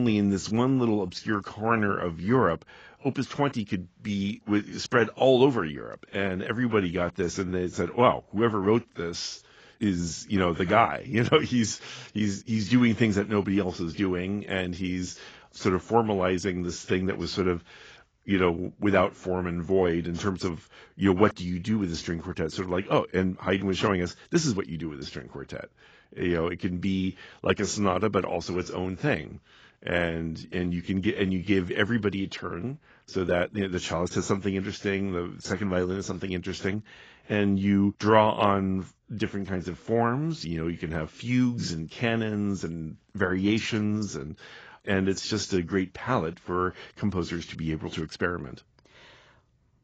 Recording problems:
garbled, watery; badly; nothing above 7.5 kHz
abrupt cut into speech; at the start

